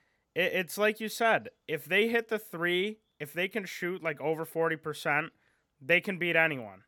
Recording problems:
none

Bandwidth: 18 kHz